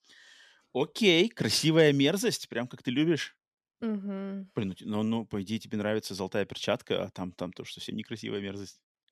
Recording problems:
none

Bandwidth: 14.5 kHz